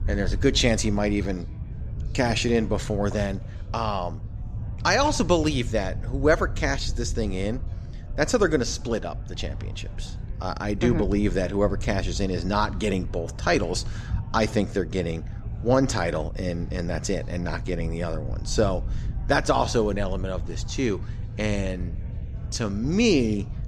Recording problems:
chatter from many people; faint; throughout; 25 dB below the speech
low rumble; faint; throughout; 20 dB below the speech

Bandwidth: 14 kHz